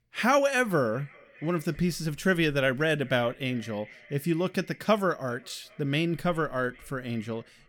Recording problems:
echo of what is said; faint; throughout; 400 ms later, 25 dB below the speech

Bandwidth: 18 kHz